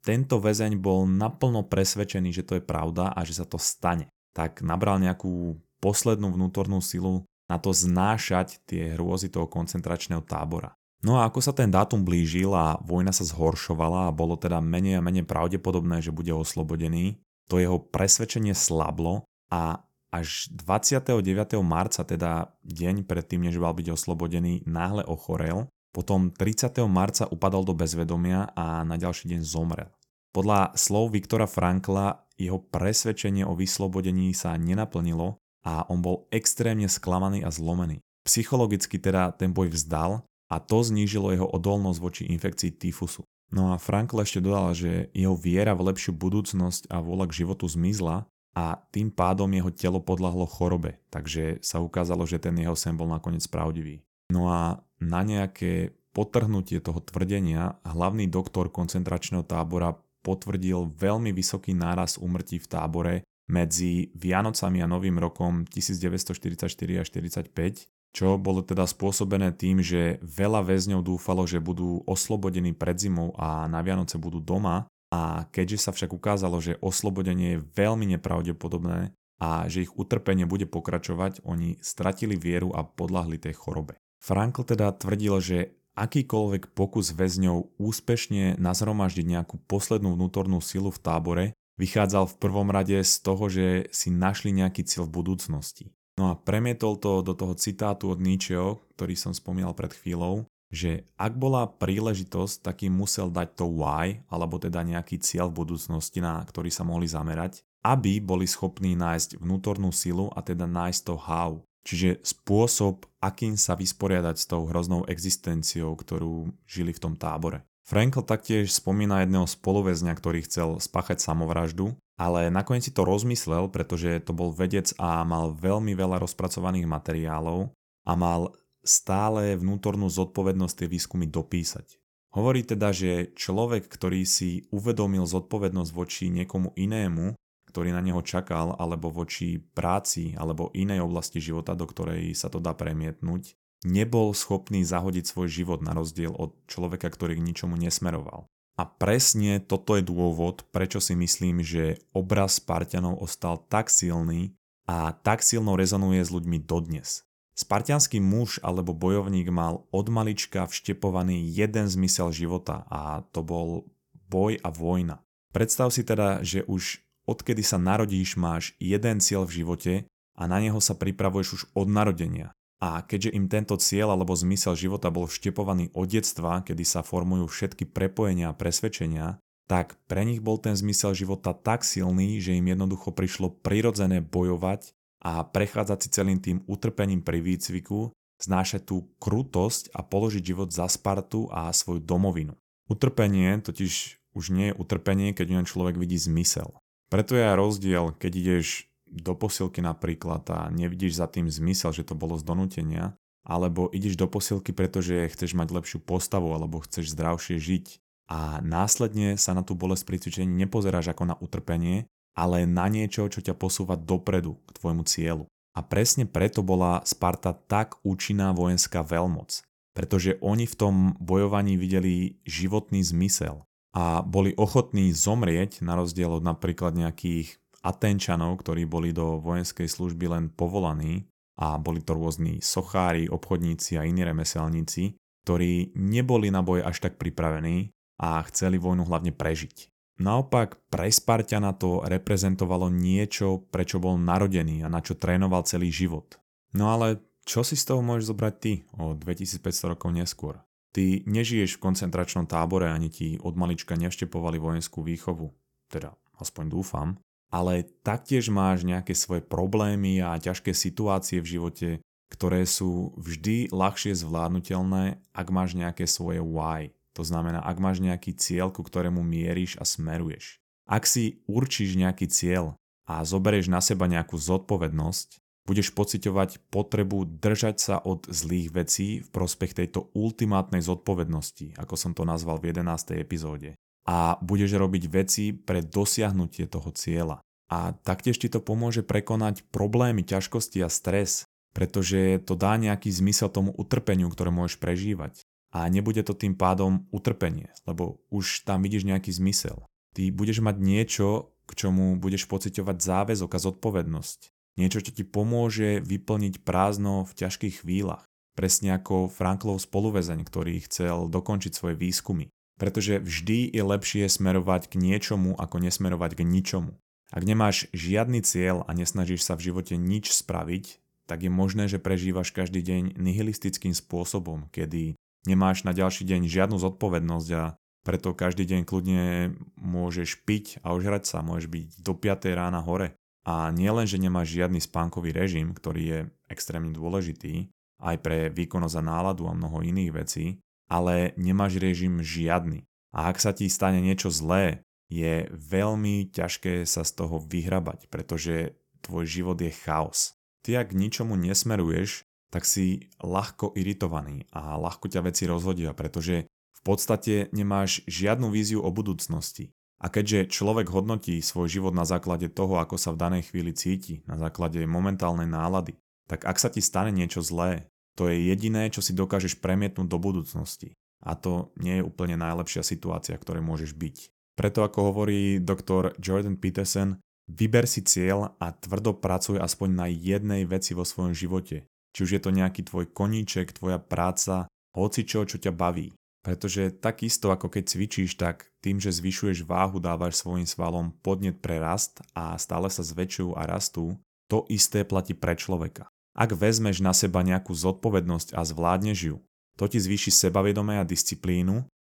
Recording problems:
none

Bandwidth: 18 kHz